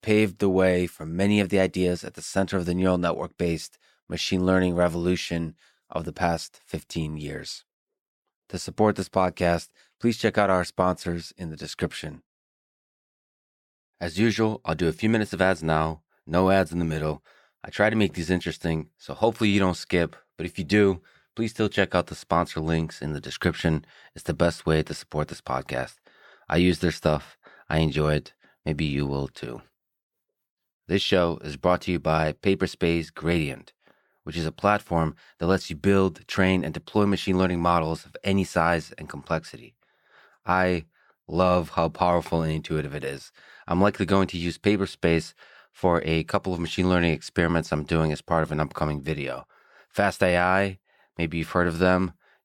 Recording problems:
none

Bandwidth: 18.5 kHz